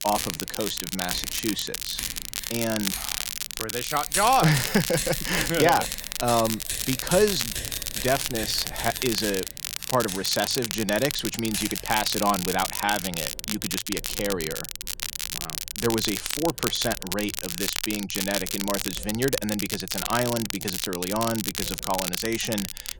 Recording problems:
household noises; loud; throughout; 9 dB below the speech
crackle, like an old record; loud; 3 dB below the speech

